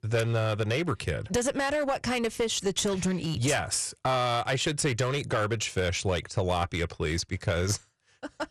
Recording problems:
distortion; slight; 6% of the sound clipped

